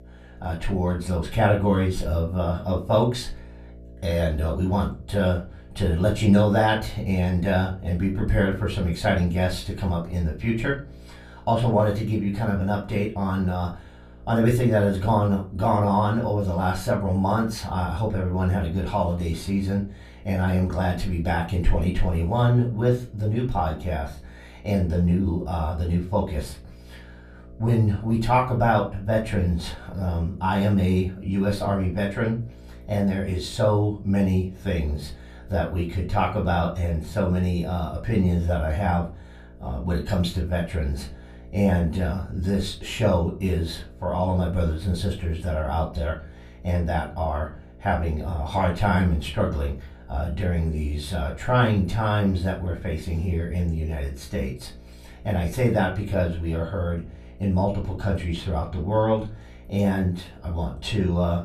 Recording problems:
off-mic speech; far
room echo; very slight; dies away in 0.3 s
electrical hum; faint; throughout; 60 Hz, 25 dB below the speech

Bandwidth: 14.5 kHz